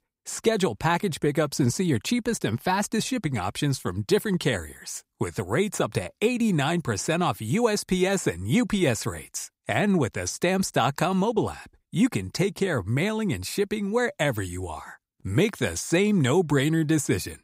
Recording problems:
none

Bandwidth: 15.5 kHz